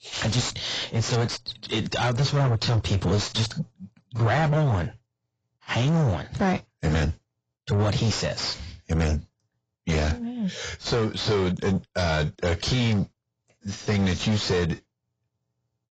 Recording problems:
distortion; heavy; 6 dB below the speech
garbled, watery; badly; nothing above 7.5 kHz

